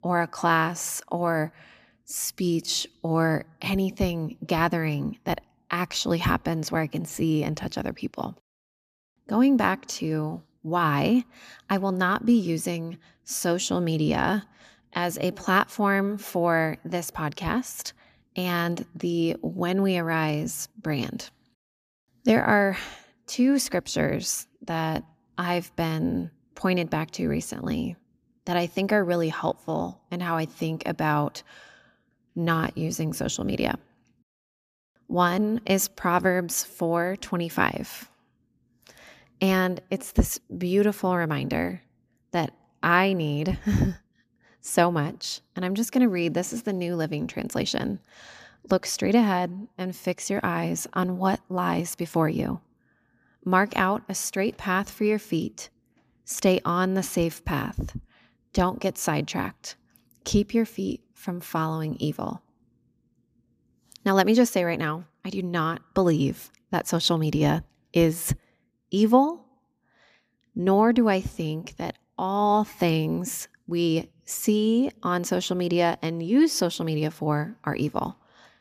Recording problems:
none

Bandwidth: 14.5 kHz